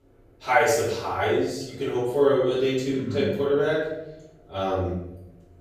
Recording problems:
off-mic speech; far
room echo; noticeable; dies away in 0.9 s

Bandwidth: 15 kHz